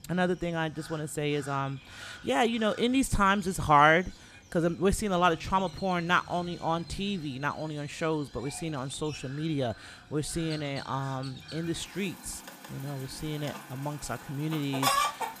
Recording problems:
animal sounds; loud; throughout; 10 dB below the speech

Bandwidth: 14.5 kHz